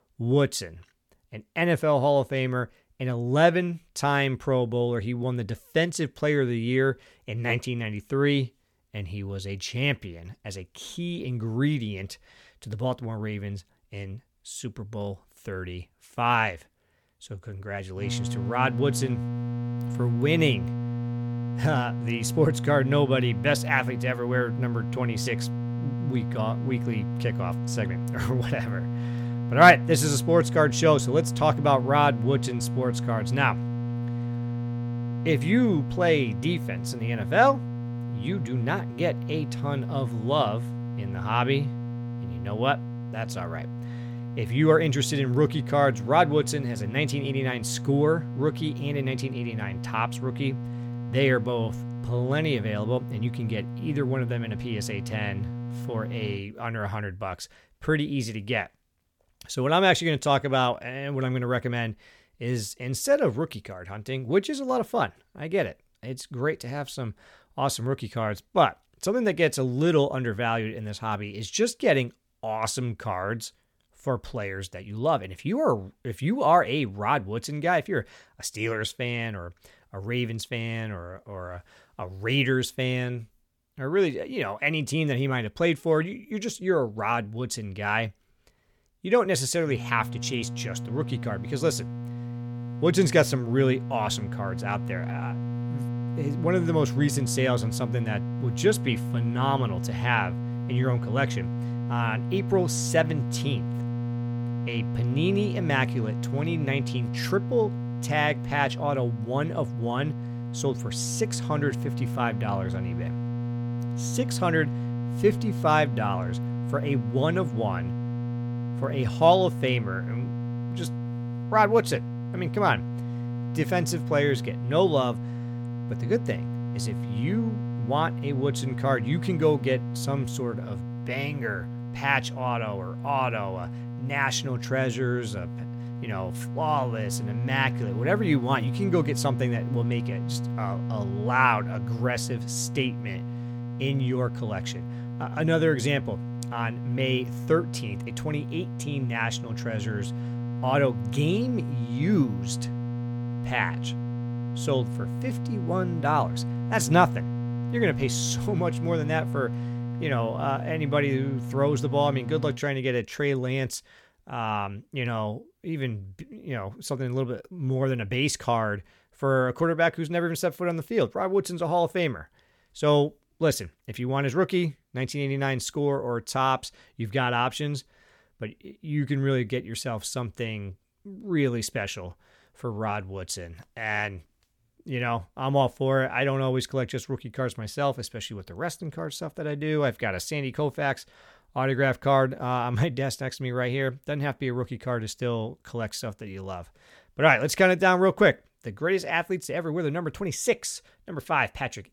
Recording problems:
electrical hum; noticeable; from 18 to 56 s and from 1:30 to 2:43; 60 Hz, 15 dB below the speech

